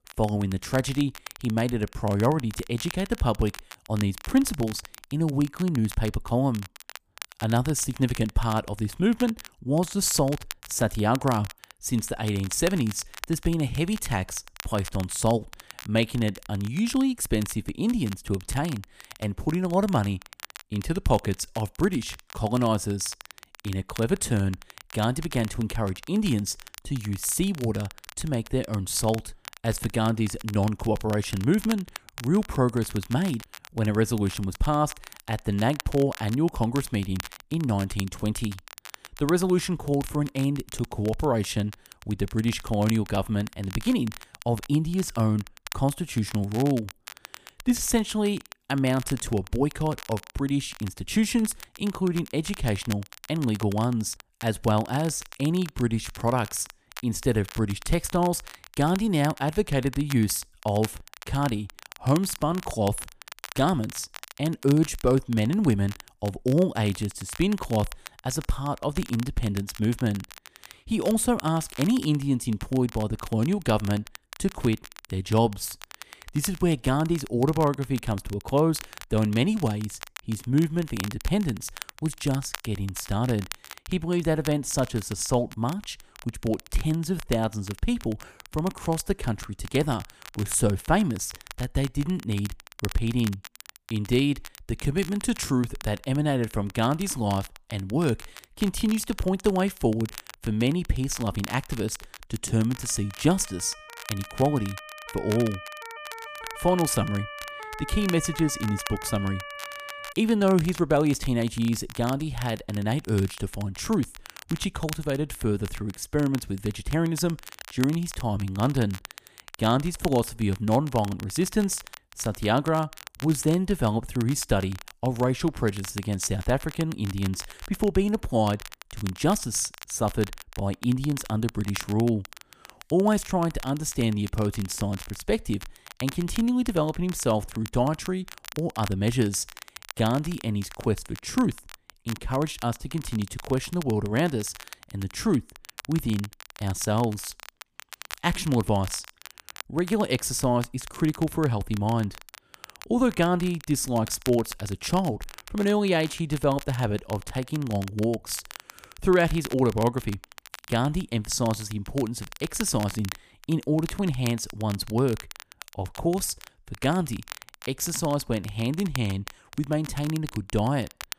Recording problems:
crackle, like an old record; noticeable; 15 dB below the speech
siren; faint; from 1:43 to 1:50; peak 10 dB below the speech

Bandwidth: 15 kHz